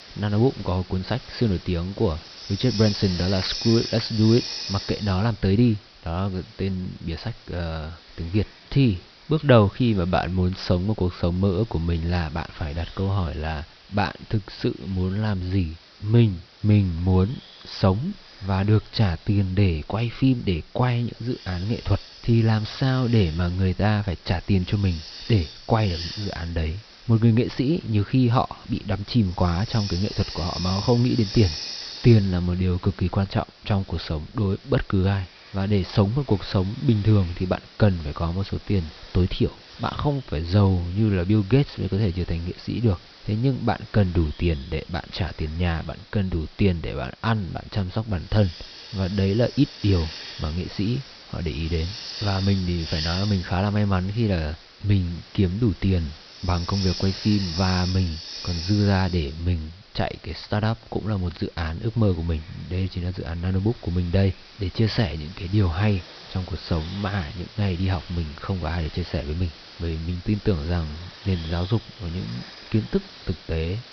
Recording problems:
high frequencies cut off; noticeable; nothing above 5.5 kHz
hiss; noticeable; throughout; 15 dB below the speech

